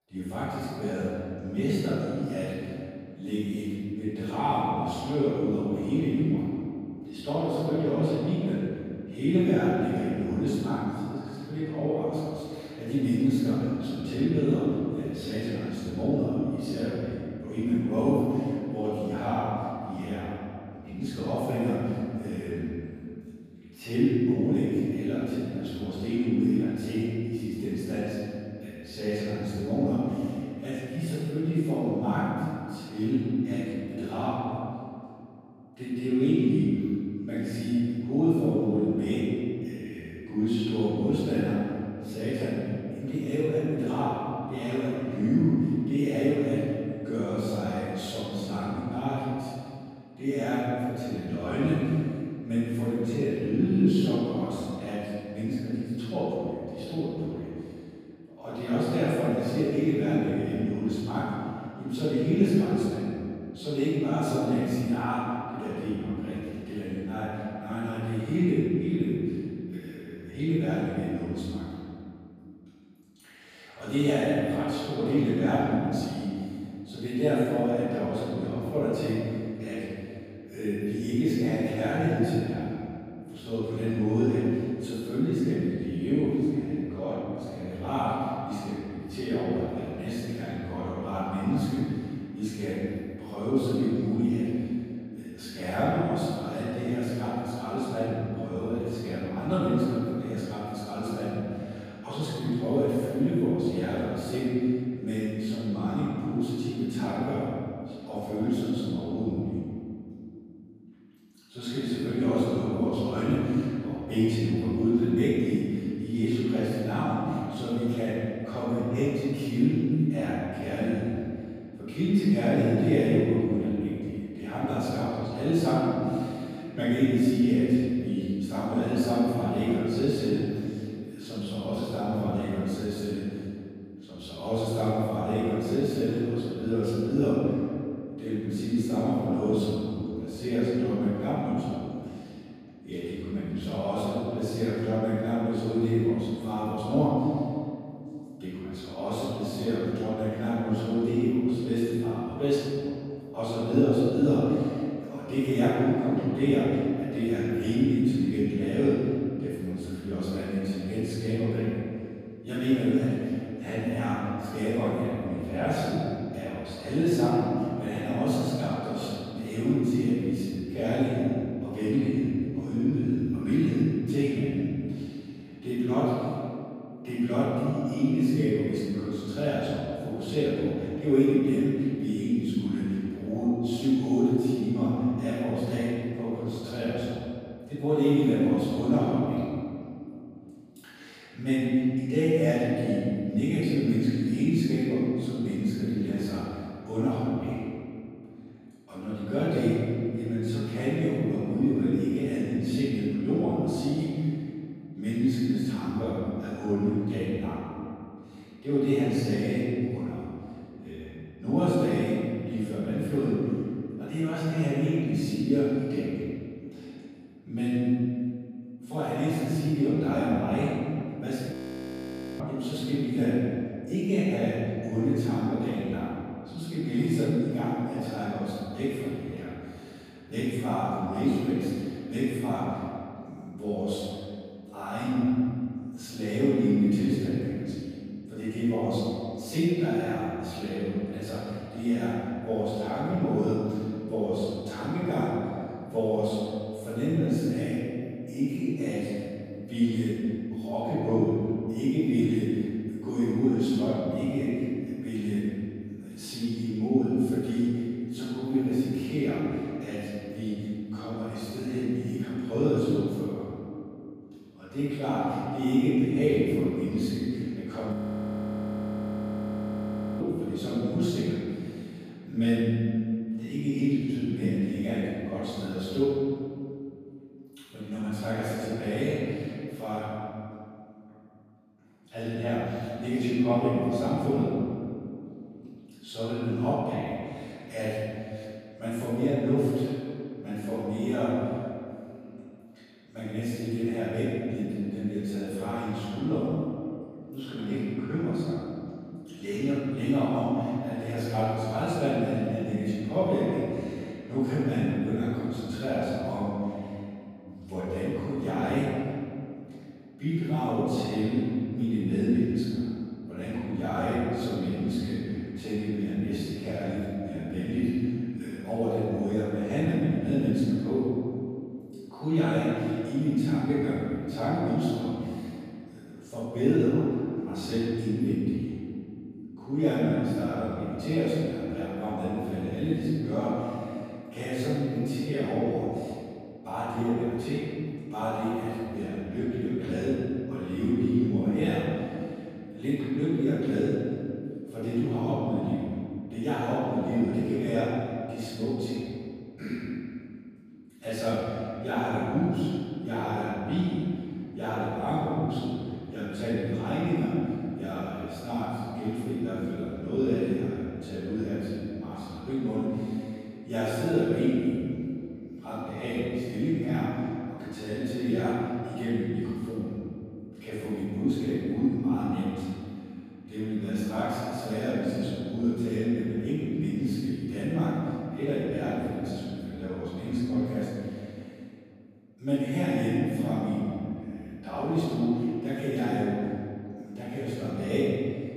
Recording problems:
room echo; strong; dies away in 2.3 s
off-mic speech; far
audio freezing; at 3:42 for 1 s and at 4:28 for 2.5 s

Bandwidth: 14.5 kHz